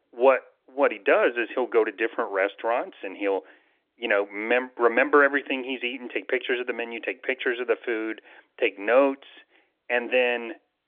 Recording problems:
phone-call audio

